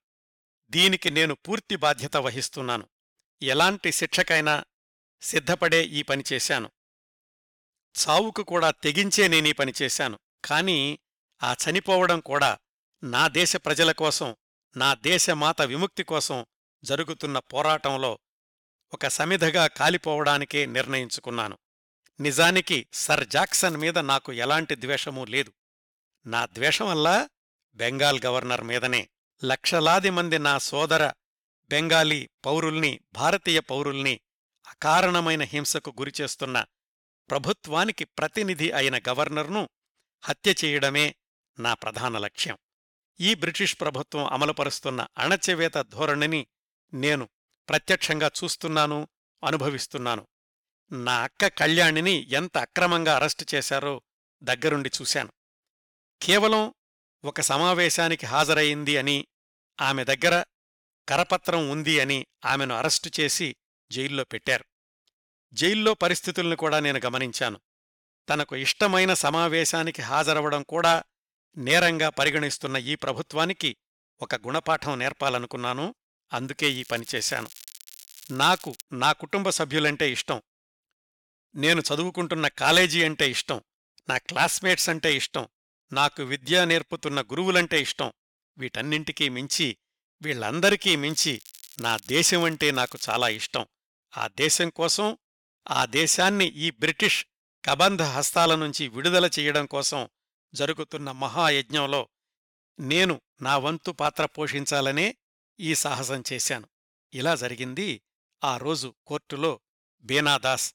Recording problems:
crackling; faint; at 23 s, from 1:17 to 1:19 and from 1:31 to 1:33; 20 dB below the speech

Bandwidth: 17 kHz